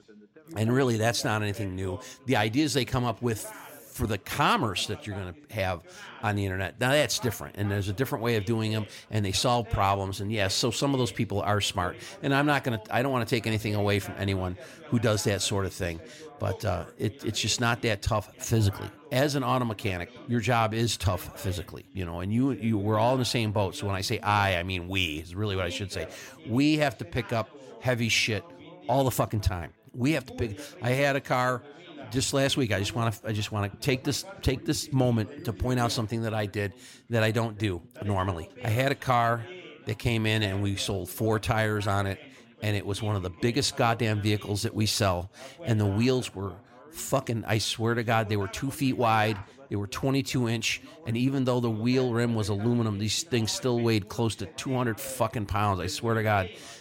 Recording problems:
background chatter; noticeable; throughout; 3 voices, 20 dB below the speech

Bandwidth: 16.5 kHz